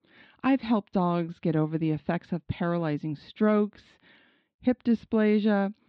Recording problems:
muffled; slightly; fading above 4 kHz

